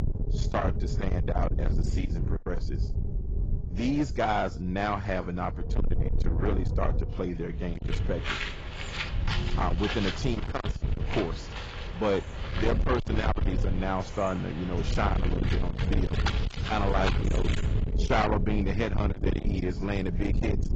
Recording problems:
distortion; heavy; 8 dB below the speech
garbled, watery; badly; nothing above 7.5 kHz
wind noise on the microphone; heavy; 8 dB below the speech
animal sounds; loud; from 8 s on; 8 dB below the speech

